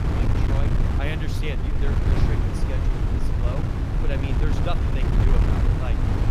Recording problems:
wind noise on the microphone; heavy; 3 dB above the speech

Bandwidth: 15 kHz